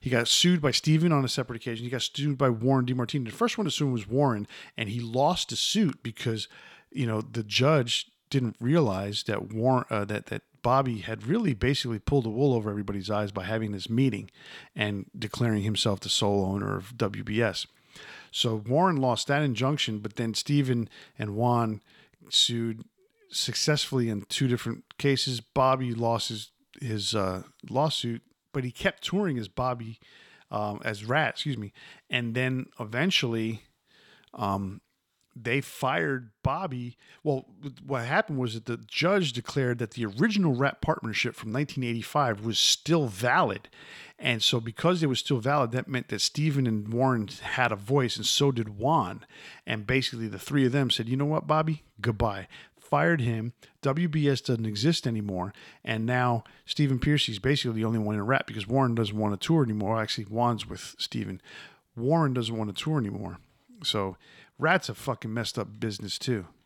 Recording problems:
none

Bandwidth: 17.5 kHz